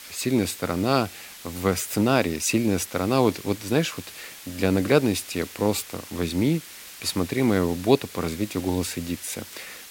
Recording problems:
hiss; noticeable; throughout; 15 dB below the speech

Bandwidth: 16.5 kHz